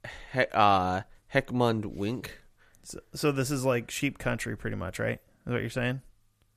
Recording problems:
none

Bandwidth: 14.5 kHz